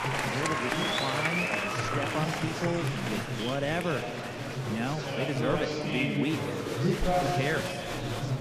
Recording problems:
murmuring crowd; very loud; throughout; 3 dB above the speech

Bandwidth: 14.5 kHz